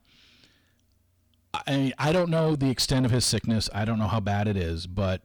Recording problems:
distortion; slight; 10 dB below the speech

